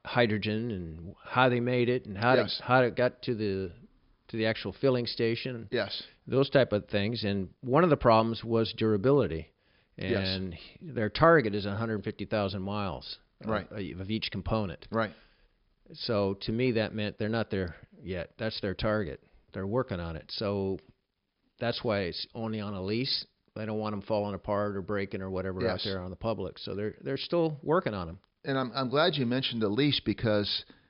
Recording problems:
high frequencies cut off; noticeable; nothing above 5.5 kHz

